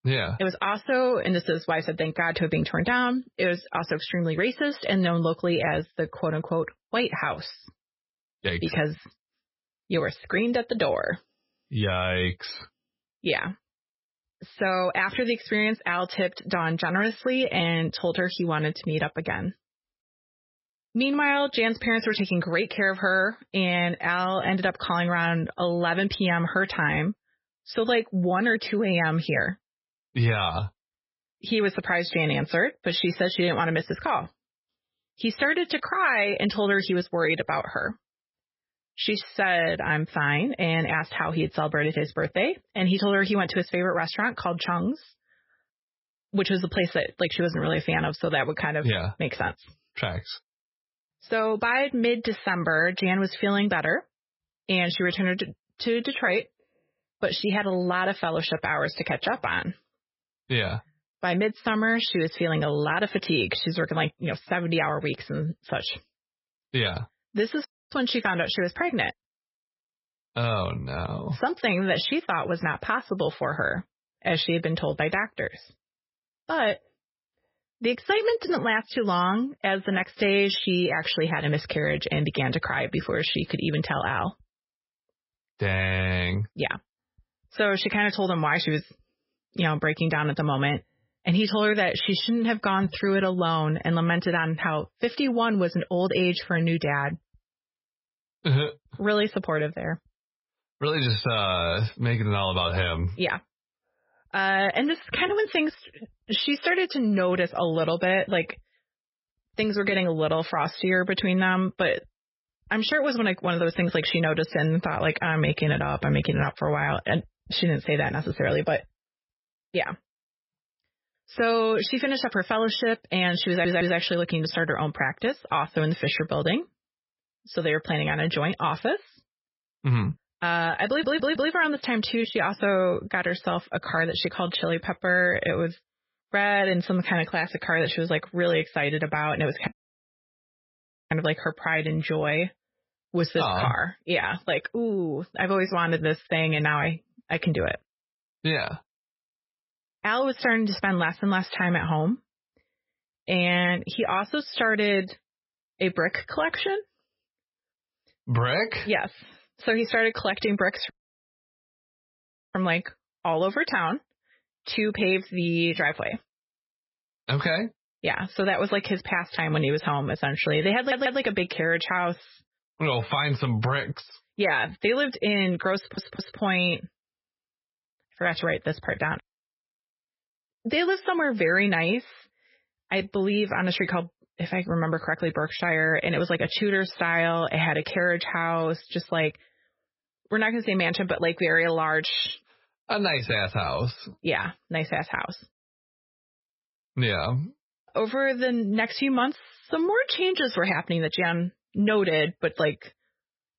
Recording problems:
garbled, watery; badly; nothing above 5.5 kHz
audio cutting out; at 1:08, at 2:20 for 1.5 s and at 2:41 for 1.5 s
audio stuttering; 4 times, first at 2:03

